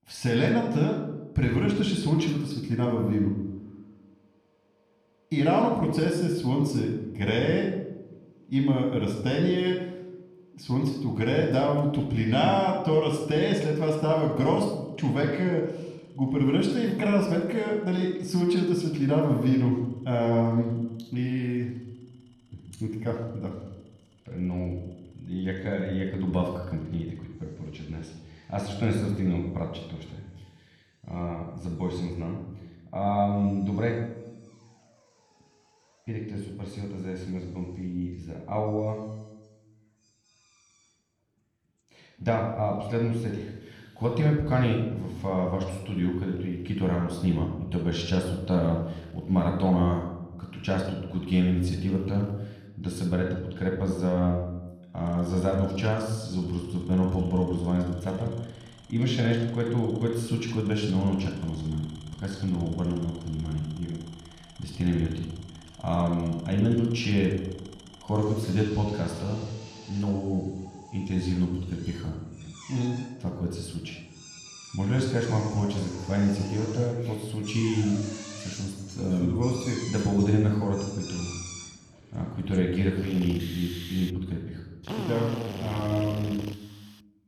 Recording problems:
room echo; noticeable; dies away in 0.8 s
off-mic speech; somewhat distant
machinery noise; noticeable; throughout; 15 dB below the speech

